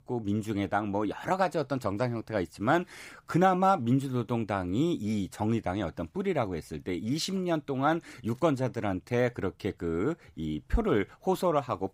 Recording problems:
none

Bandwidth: 15.5 kHz